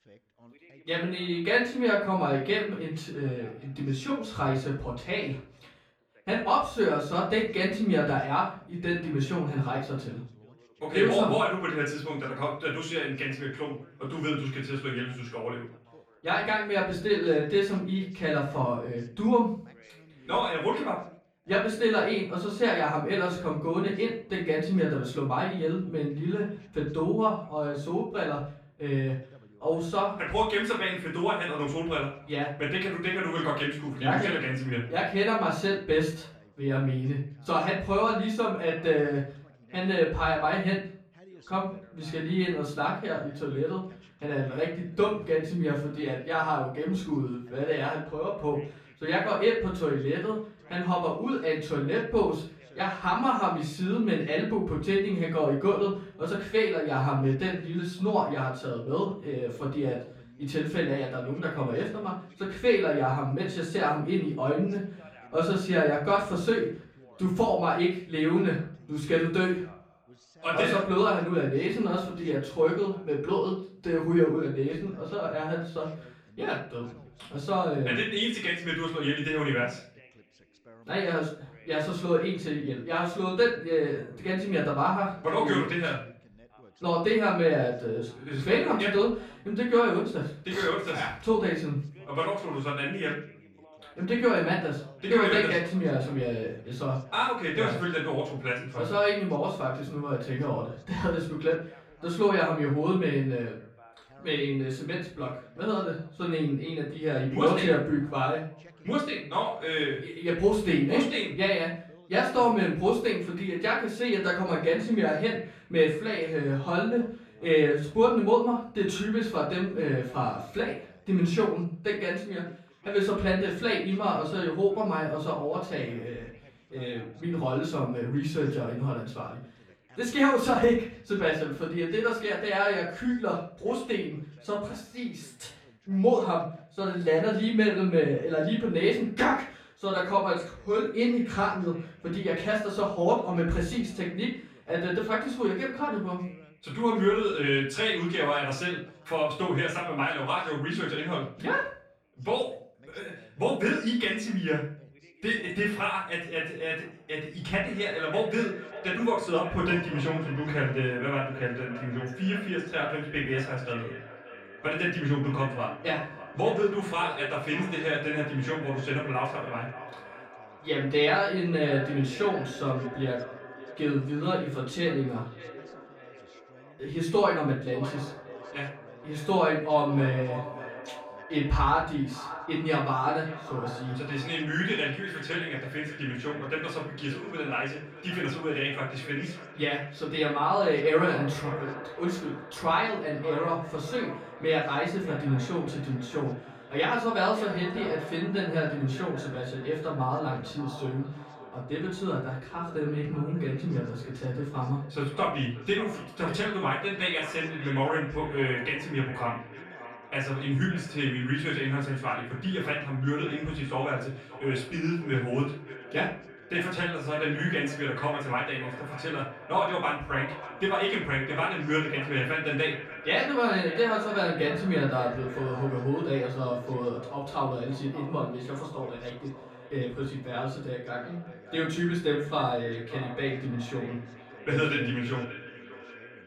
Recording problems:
off-mic speech; far
echo of what is said; noticeable; from 2:38 on; 590 ms later, 15 dB below the speech
room echo; slight; dies away in 0.4 s
background chatter; faint; throughout; 2 voices, 25 dB below the speech

